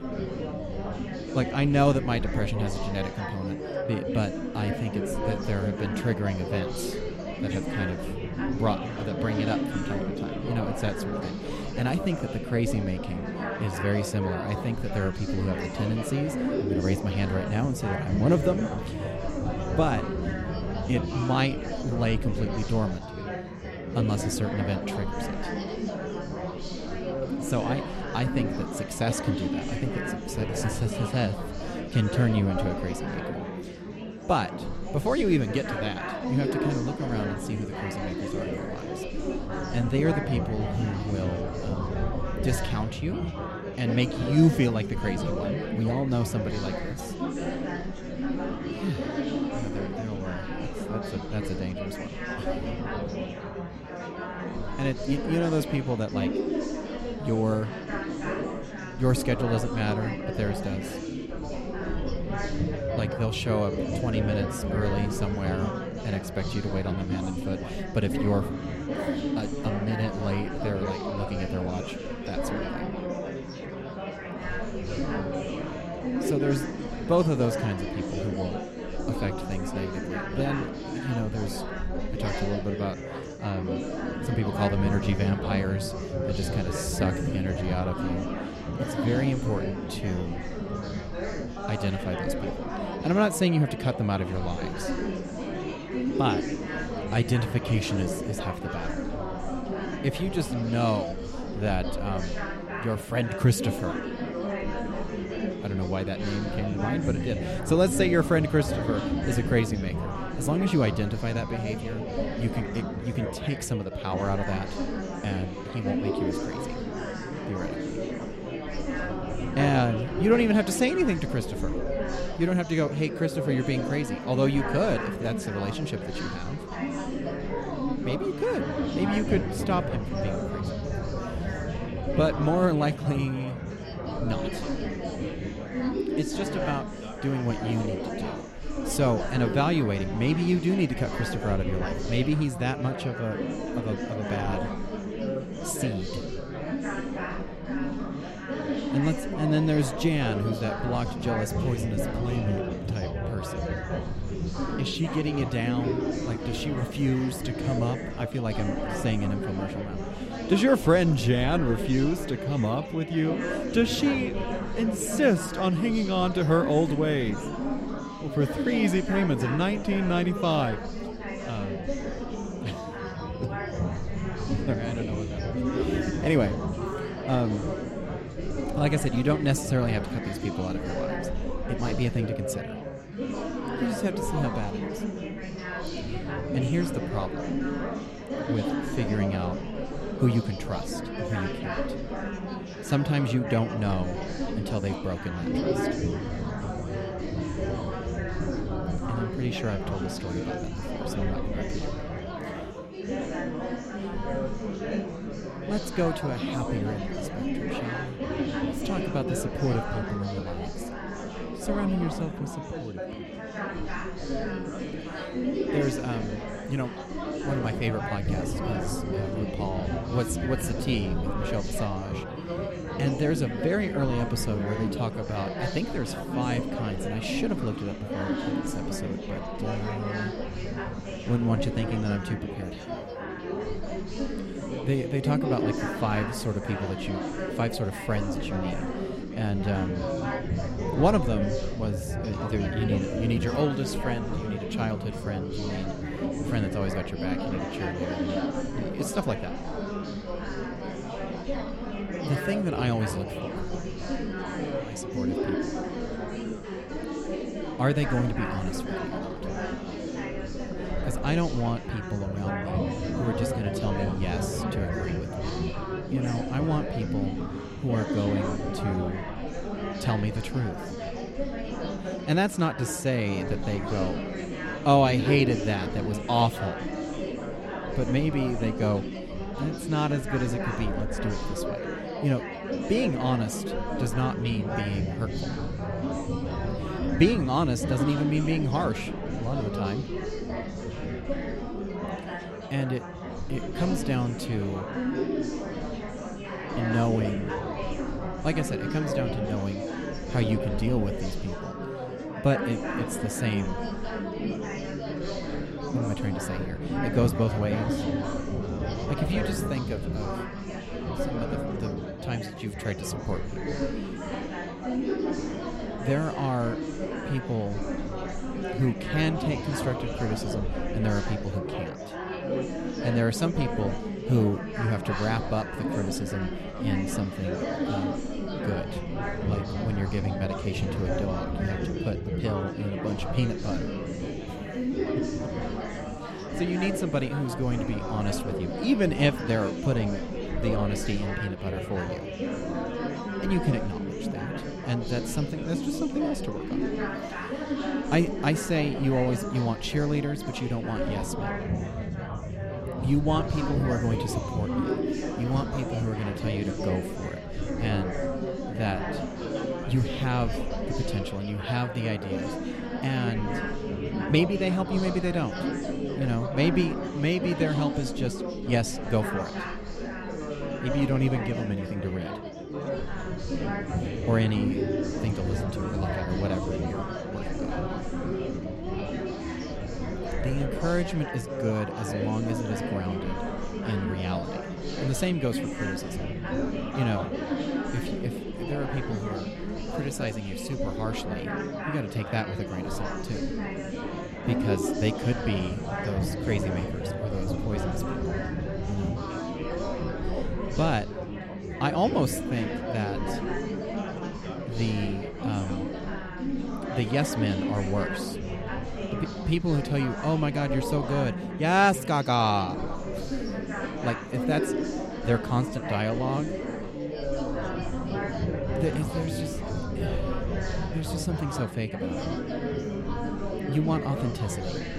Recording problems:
chatter from many people; loud; throughout; 3 dB below the speech

